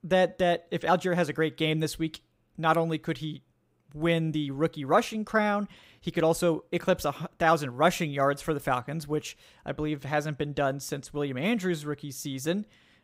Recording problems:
none

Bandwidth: 15.5 kHz